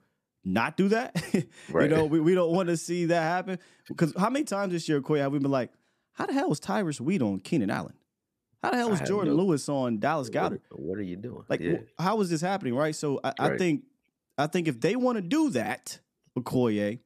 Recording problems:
none

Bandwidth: 14.5 kHz